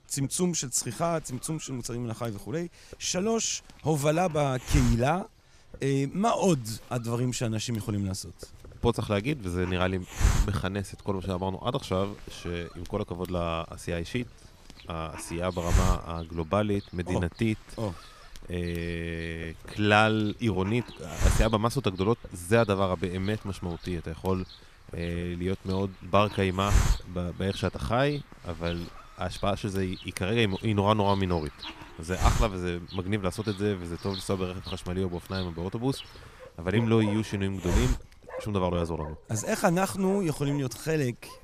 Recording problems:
hiss; loud; throughout; 4 dB below the speech
animal sounds; noticeable; throughout; 20 dB below the speech

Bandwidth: 15 kHz